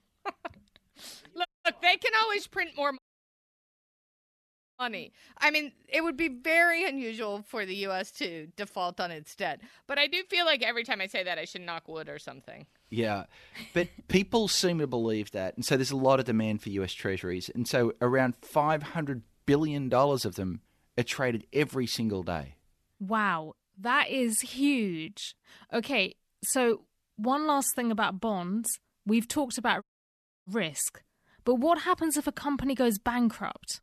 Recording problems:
audio cutting out; at 1.5 s, at 3 s for 2 s and at 30 s for 0.5 s

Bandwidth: 13.5 kHz